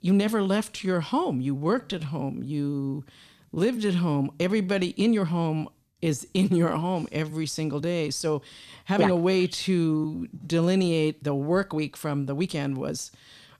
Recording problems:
uneven, jittery; strongly; from 0.5 to 13 s

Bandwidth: 14 kHz